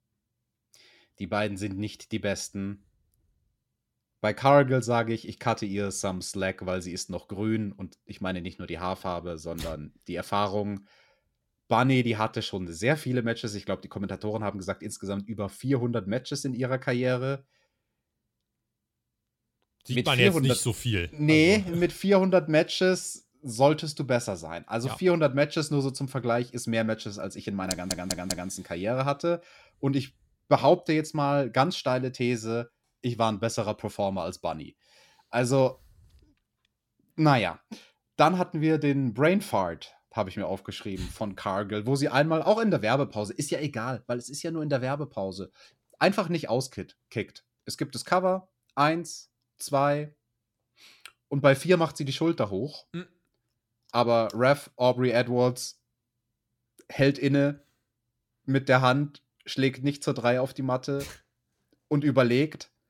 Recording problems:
audio stuttering; at 28 s

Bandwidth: 17 kHz